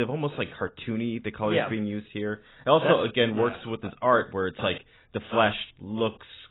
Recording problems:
garbled, watery; badly; nothing above 3.5 kHz
abrupt cut into speech; at the start

